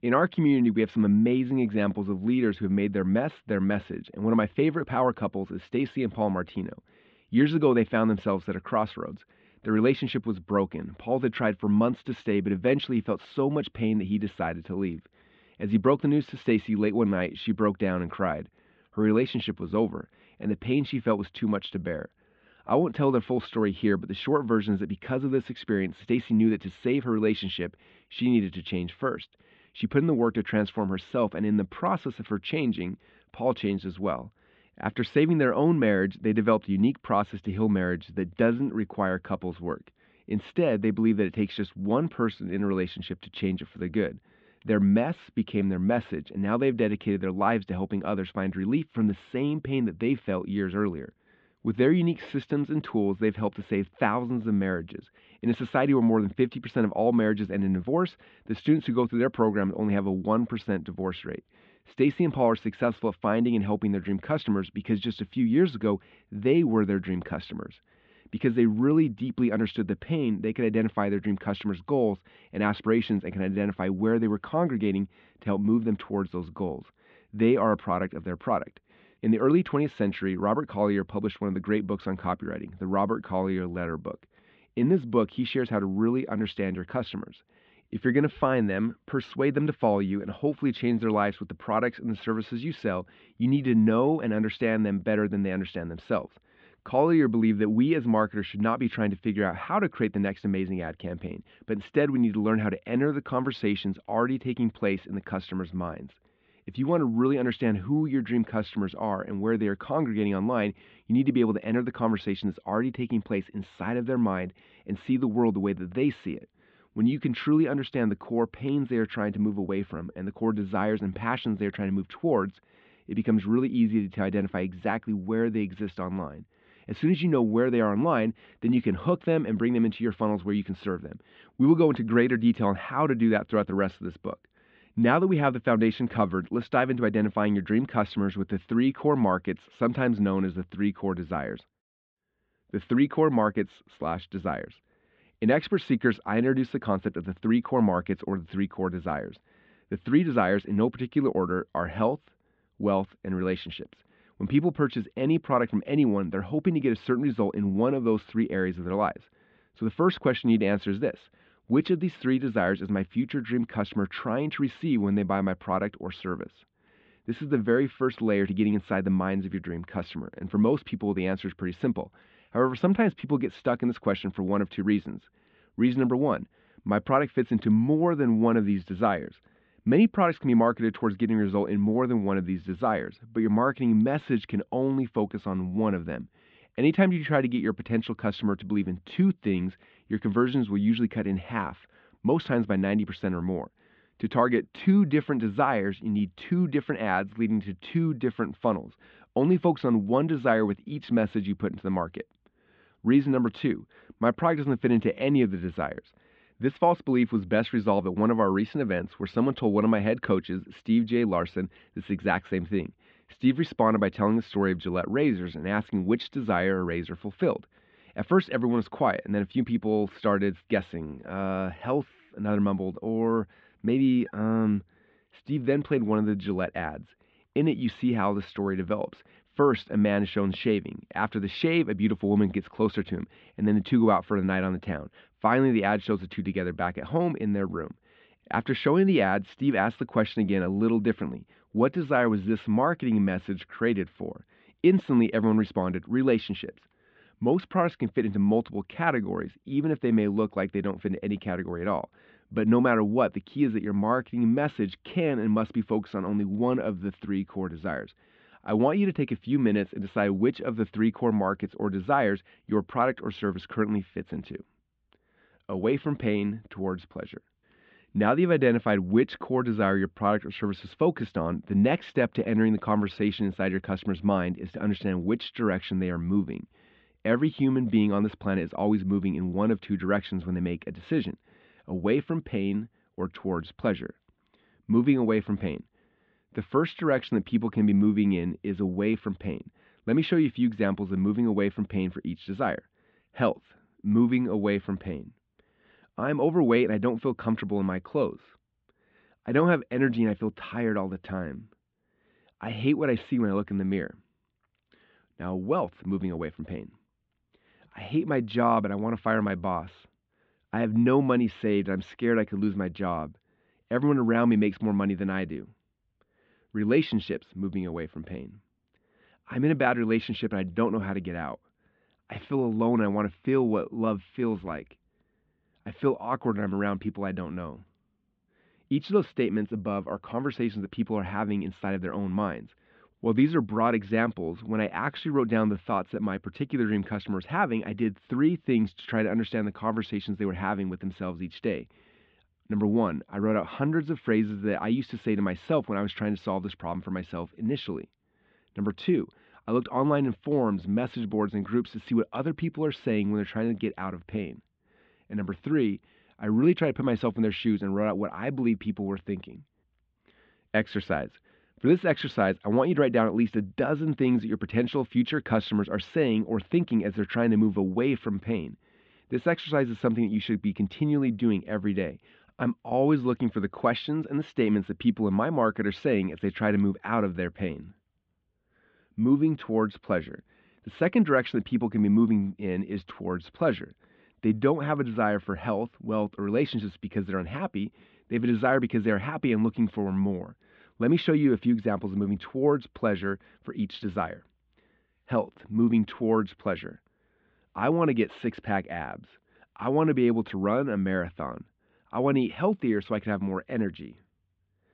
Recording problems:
muffled; very; fading above 3.5 kHz

